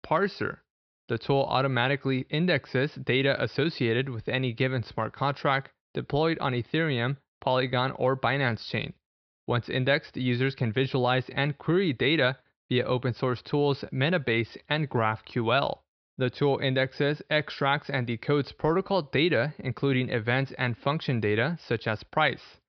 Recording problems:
high frequencies cut off; noticeable; nothing above 5.5 kHz

